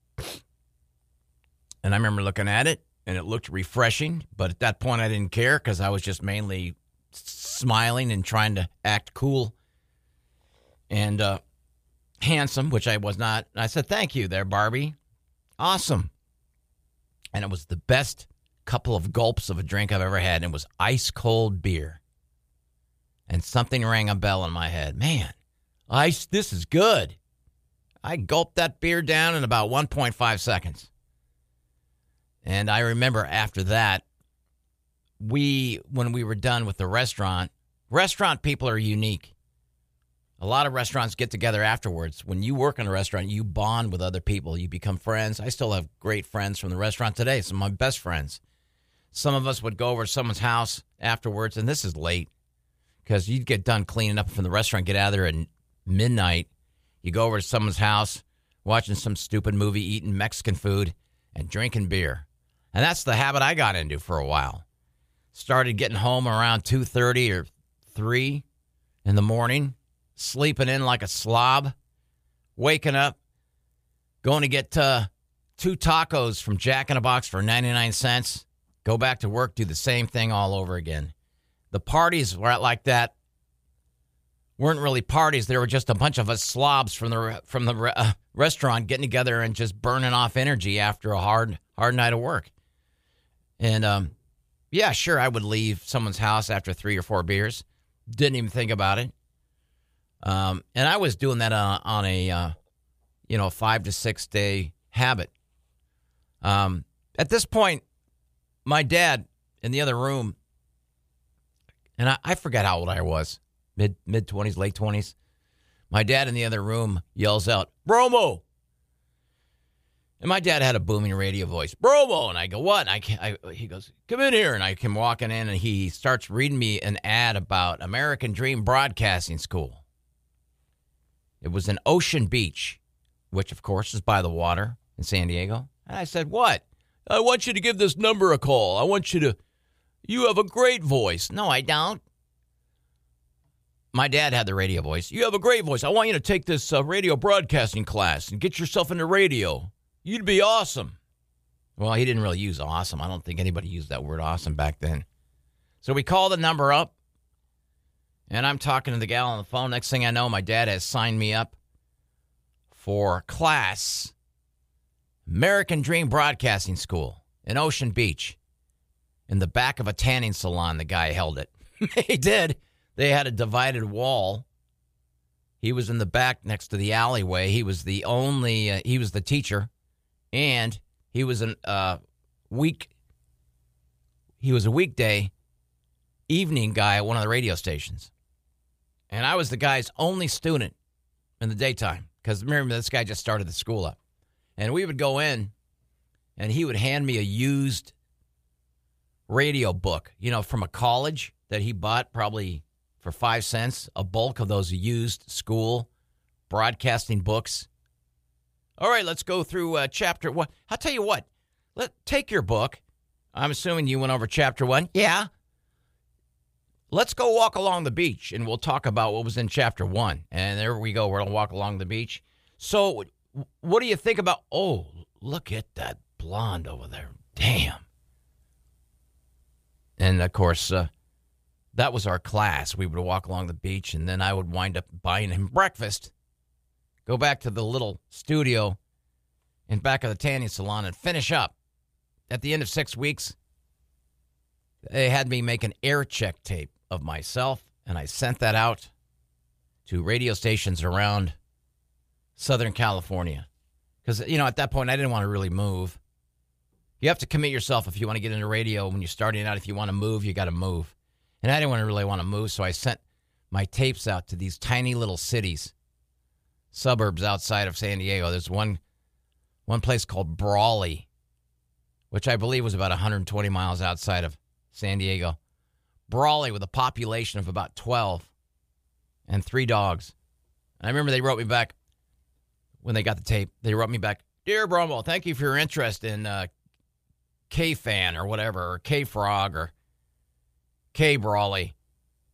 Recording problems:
none

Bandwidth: 15 kHz